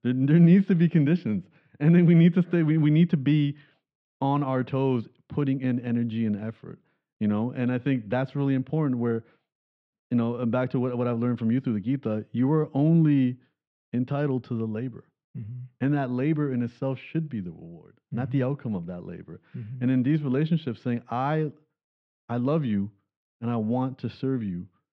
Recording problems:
muffled; slightly; fading above 3.5 kHz

